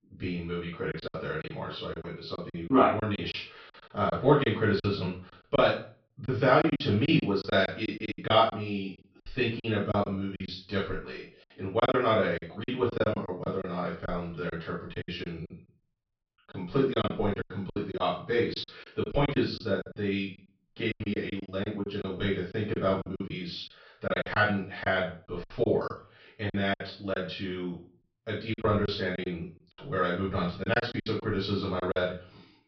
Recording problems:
off-mic speech; far
high frequencies cut off; noticeable; nothing above 5.5 kHz
room echo; slight; dies away in 0.3 s
choppy; very; 12% of the speech affected

